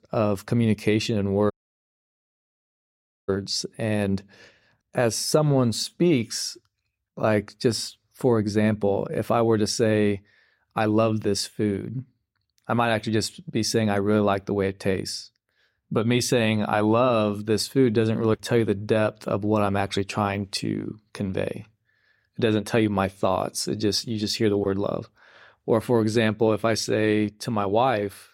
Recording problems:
audio cutting out; at 1.5 s for 2 s

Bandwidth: 16 kHz